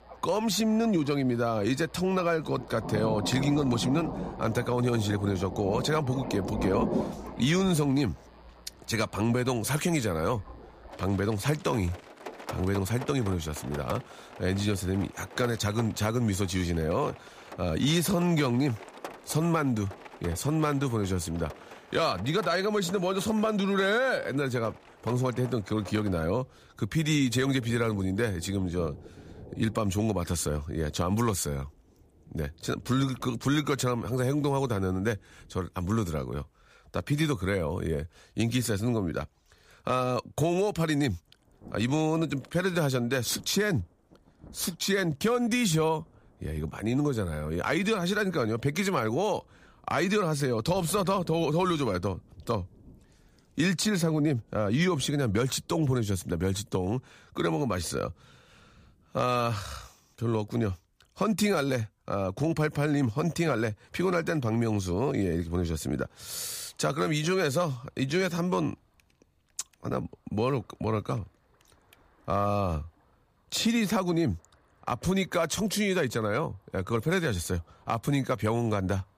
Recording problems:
rain or running water; noticeable; throughout; 15 dB below the speech

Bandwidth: 15 kHz